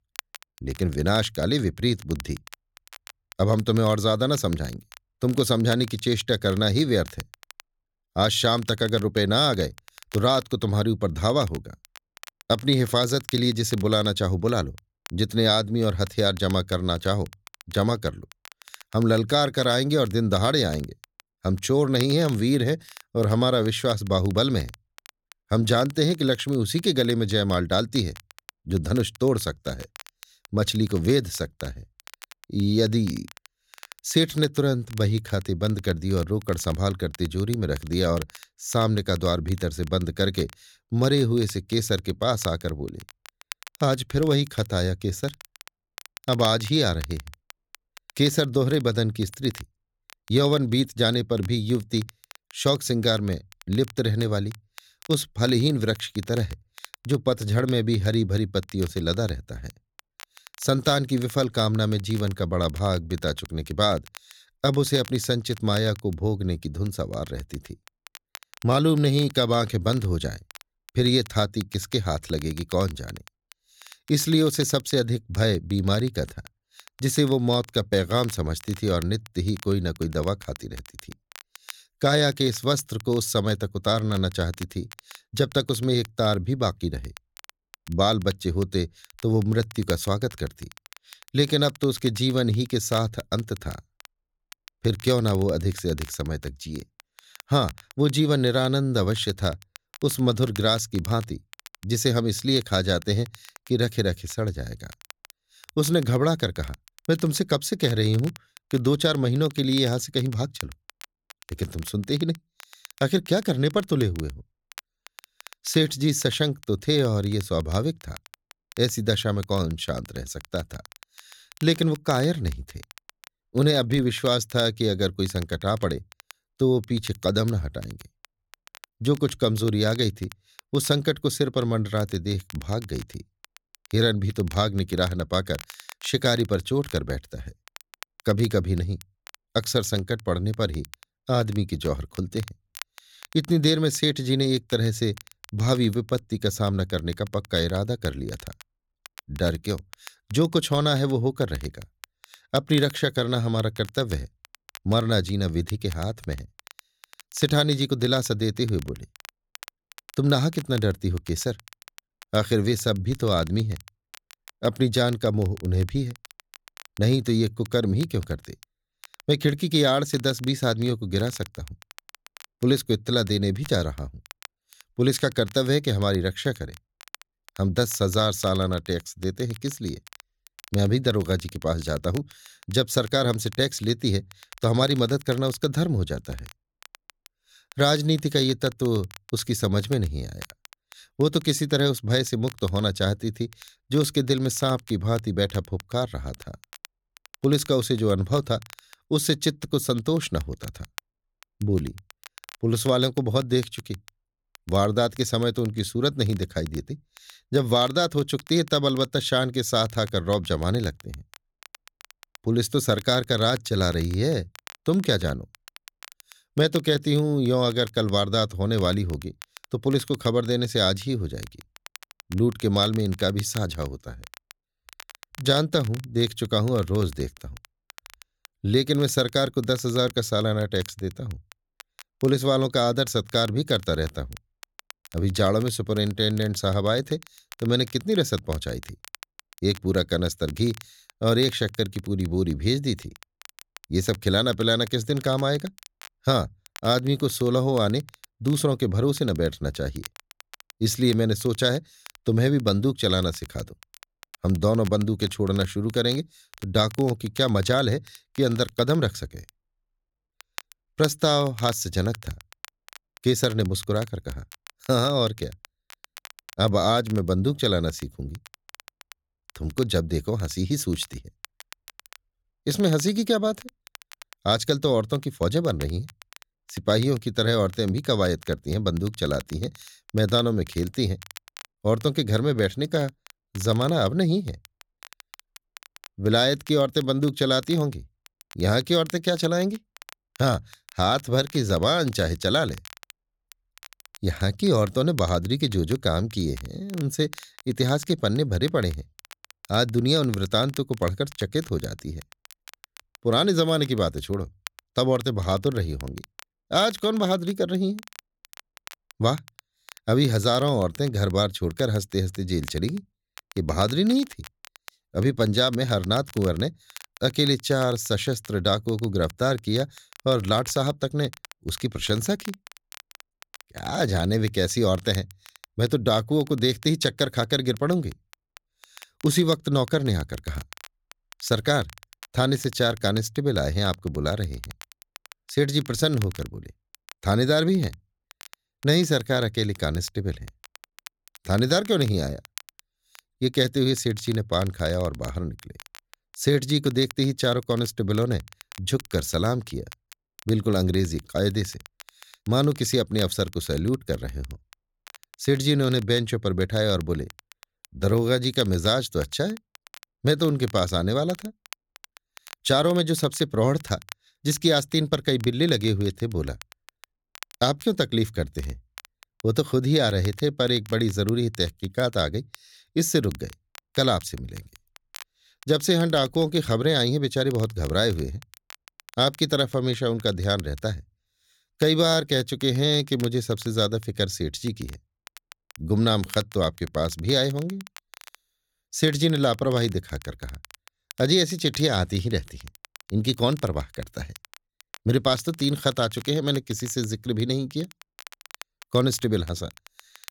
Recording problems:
crackle, like an old record; faint; 20 dB below the speech

